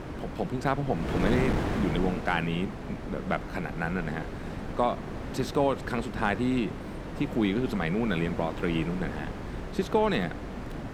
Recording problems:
wind noise on the microphone; heavy; 7 dB below the speech

